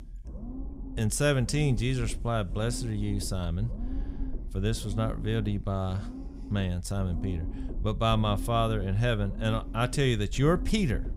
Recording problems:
low rumble; noticeable; throughout; 15 dB below the speech

